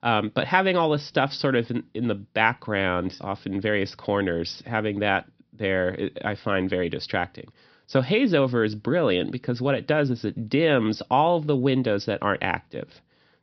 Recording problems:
high frequencies cut off; noticeable; nothing above 5.5 kHz

